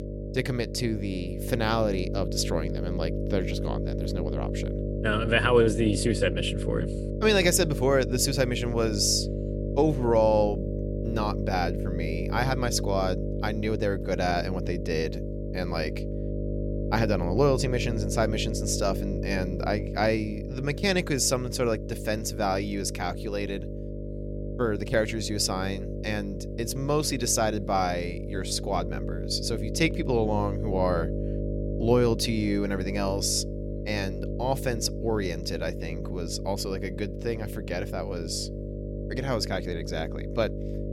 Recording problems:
electrical hum; loud; throughout; 50 Hz, 10 dB below the speech

